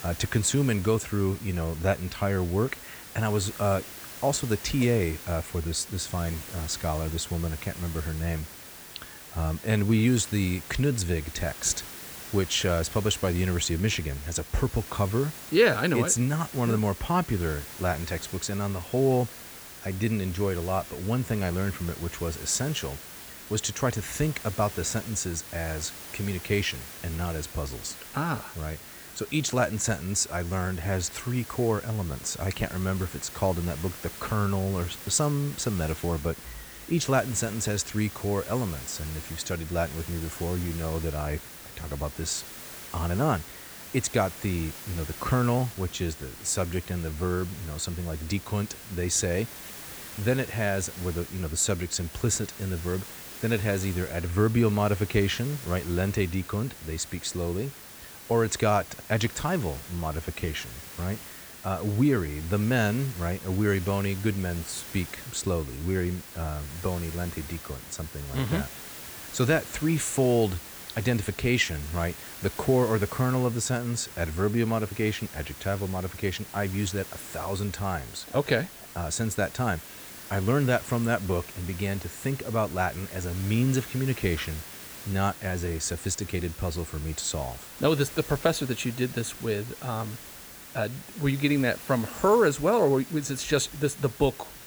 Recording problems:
hiss; noticeable; throughout; 10 dB below the speech

